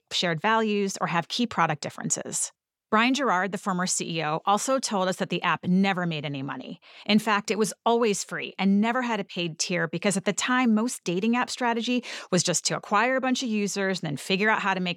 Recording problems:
none

